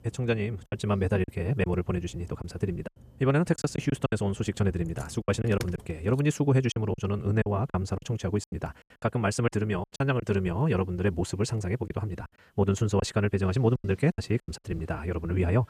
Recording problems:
wrong speed, natural pitch; too fast; 1.8 times normal speed
traffic noise; faint; throughout; 20 dB below the speech
choppy; very; 9% of the speech affected

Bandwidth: 14.5 kHz